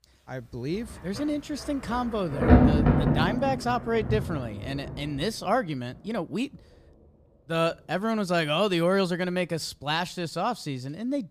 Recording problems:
rain or running water; very loud; throughout; 3 dB above the speech

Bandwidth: 15 kHz